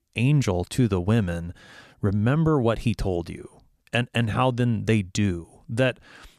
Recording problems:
none

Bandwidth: 14.5 kHz